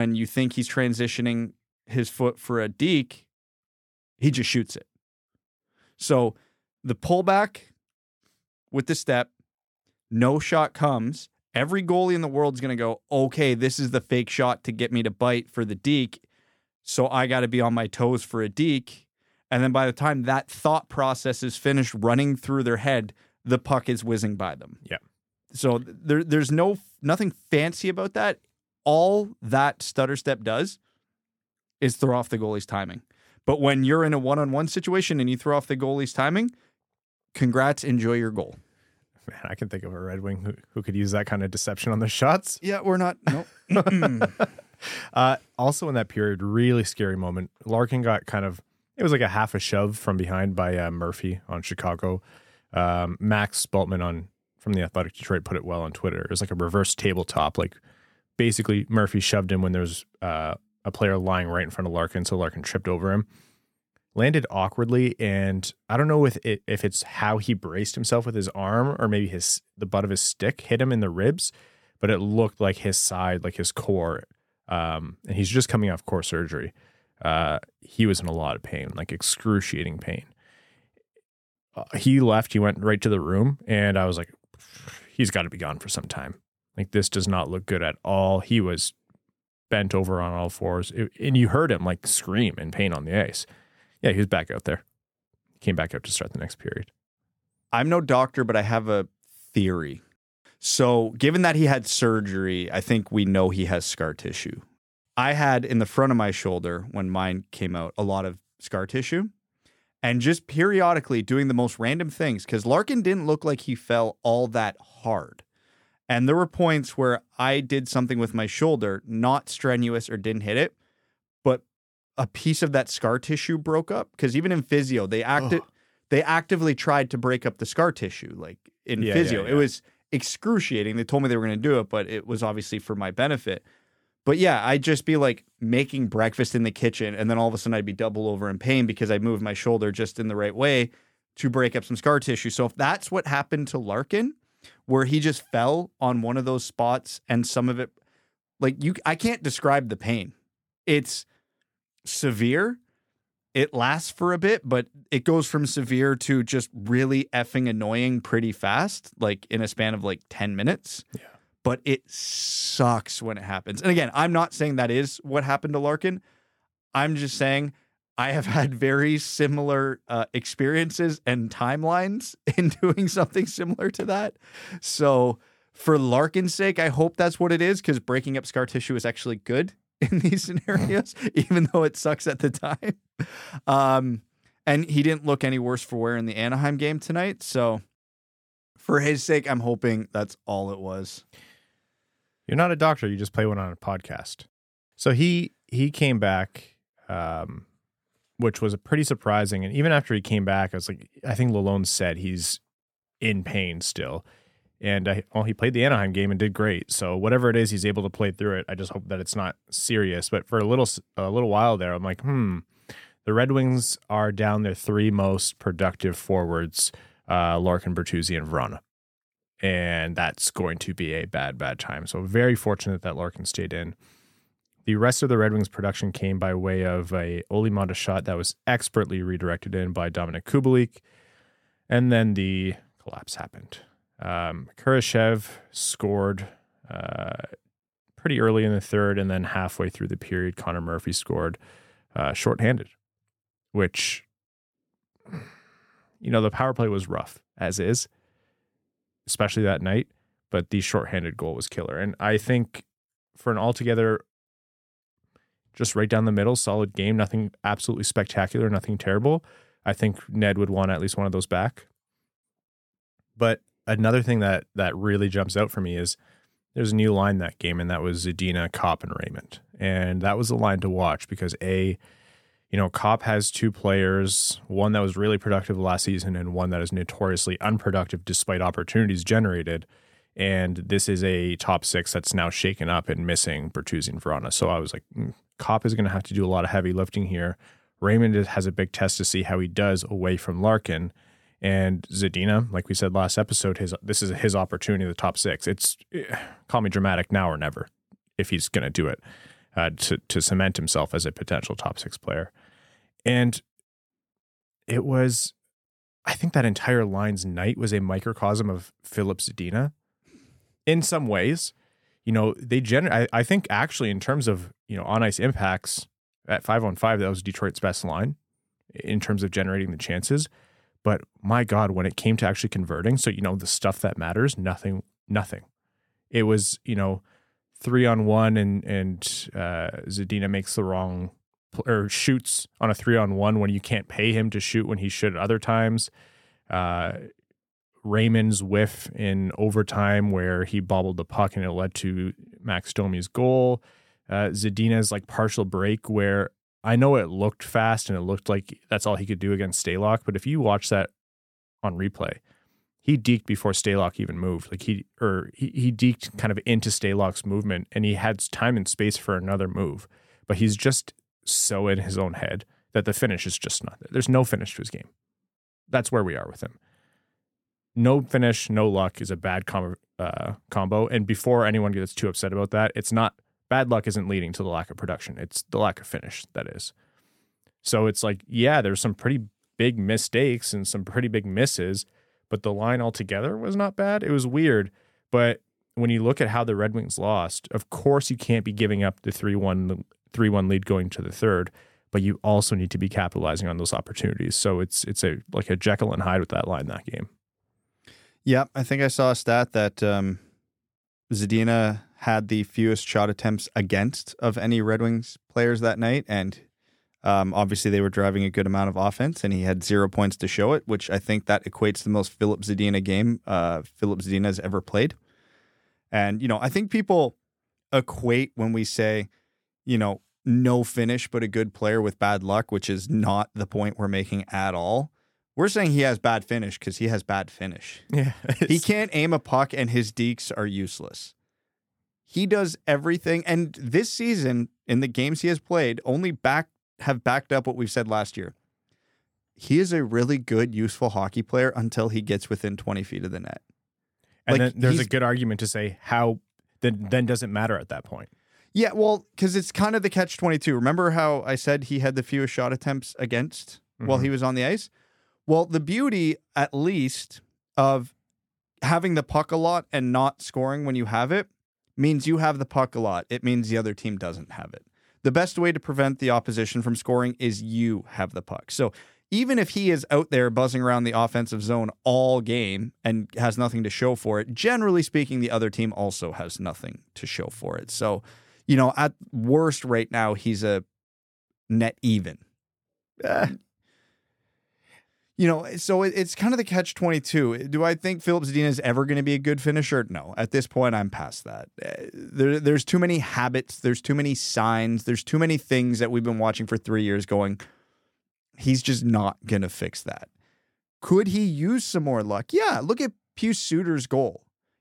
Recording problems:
abrupt cut into speech; at the start

